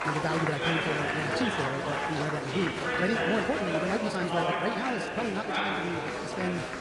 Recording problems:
wrong speed, natural pitch; too fast; 1.5 times normal speed
garbled, watery; slightly; nothing above 10 kHz
chatter from many people; very loud; throughout; 3 dB above the speech

